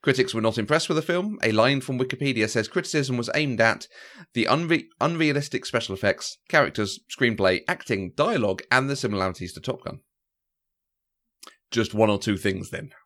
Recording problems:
none

